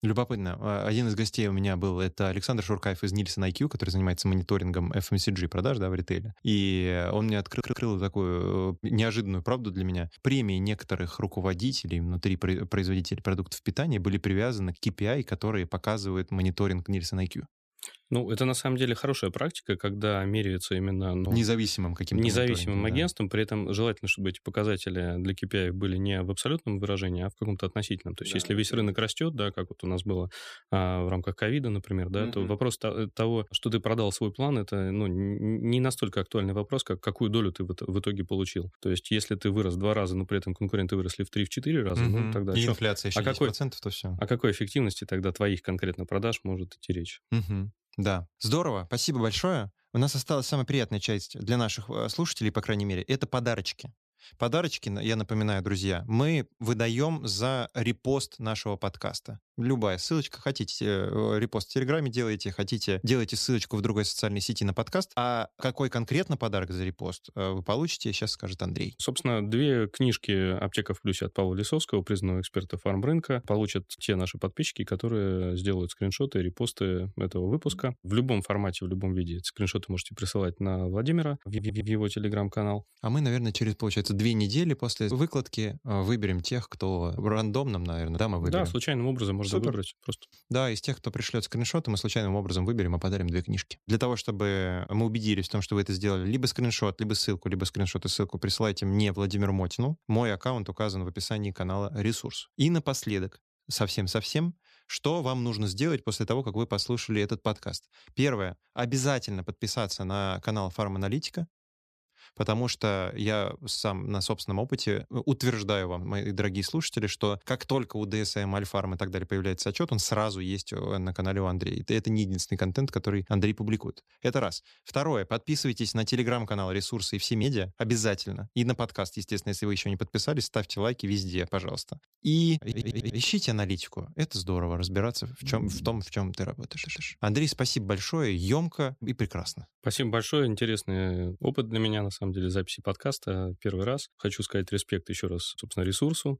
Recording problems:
audio stuttering; 4 times, first at 7.5 s

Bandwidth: 14.5 kHz